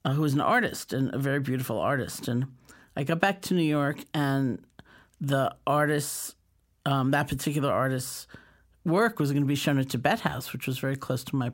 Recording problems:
none

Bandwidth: 16 kHz